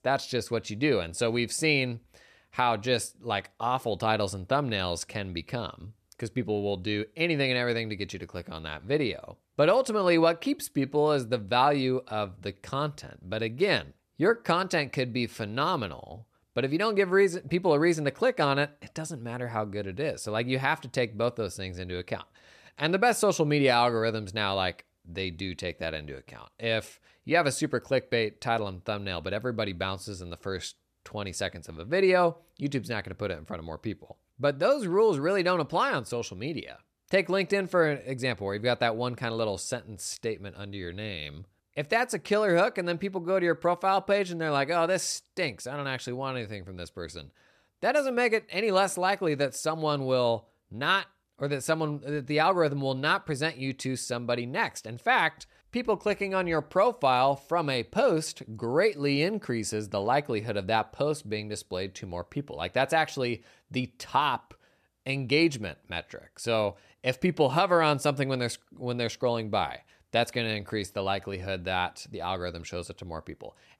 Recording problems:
none

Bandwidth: 14 kHz